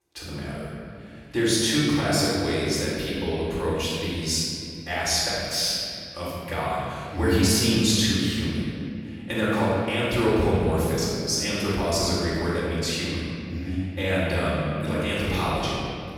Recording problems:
room echo; strong; dies away in 2.5 s
off-mic speech; far

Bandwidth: 17 kHz